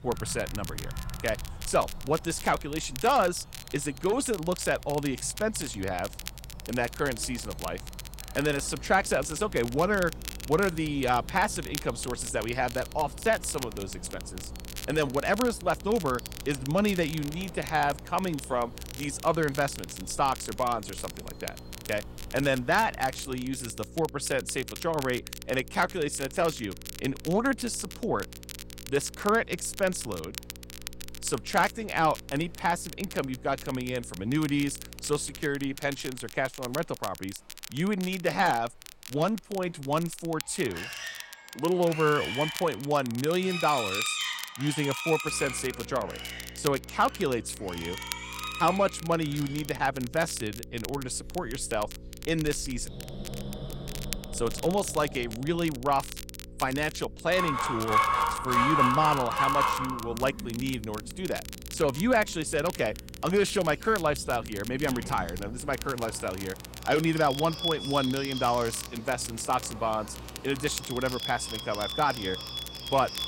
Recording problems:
animal sounds; loud; throughout; 6 dB below the speech
crackle, like an old record; noticeable; 15 dB below the speech
electrical hum; faint; from 8.5 to 35 s and from 45 s on; 60 Hz, 25 dB below the speech

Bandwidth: 16 kHz